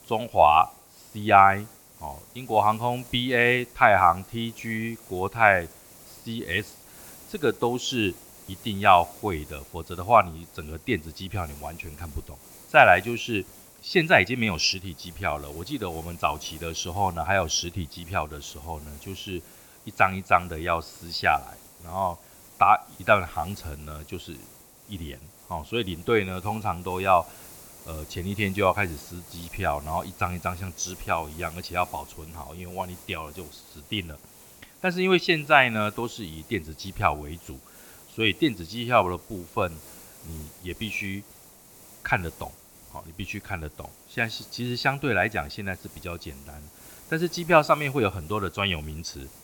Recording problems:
high frequencies cut off; noticeable; nothing above 8 kHz
hiss; faint; throughout; 20 dB below the speech

